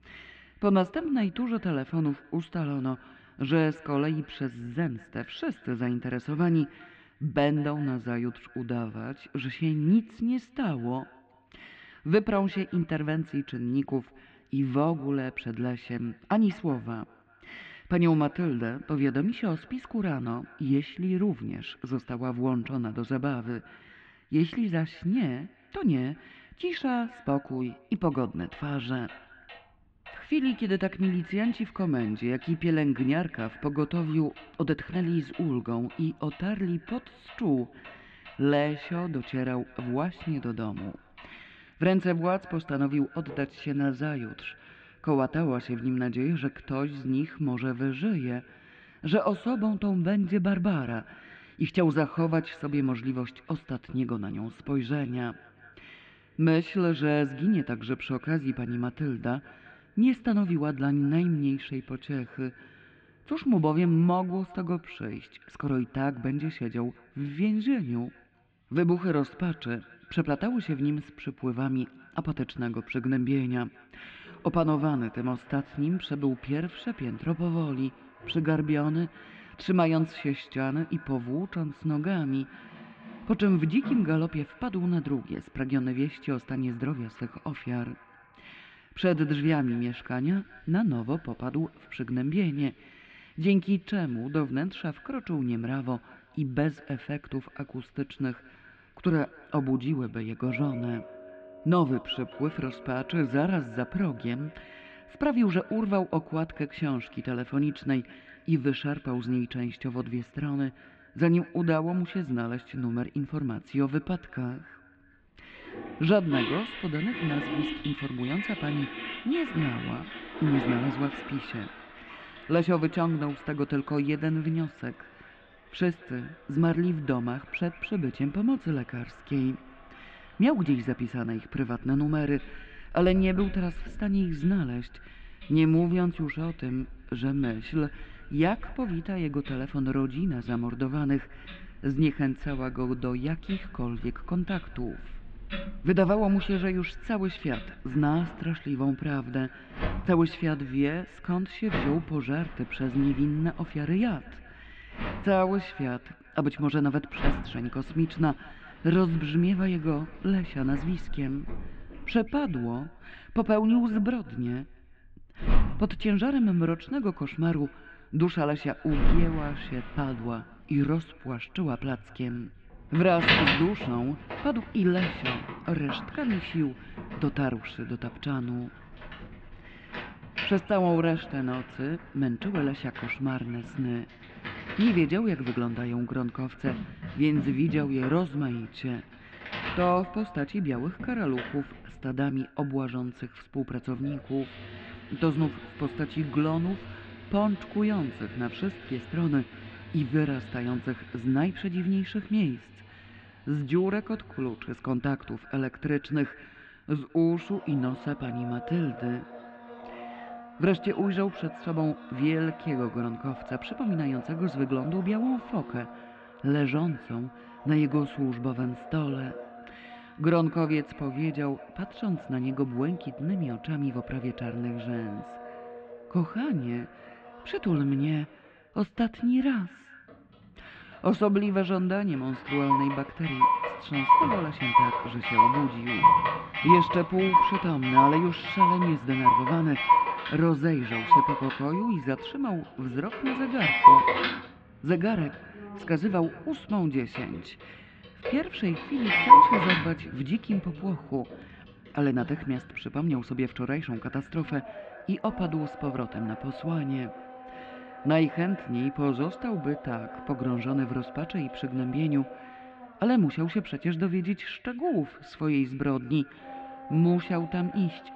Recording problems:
muffled; very; fading above 3 kHz
echo of what is said; faint; throughout; 190 ms later, 25 dB below the speech
household noises; loud; throughout; as loud as the speech

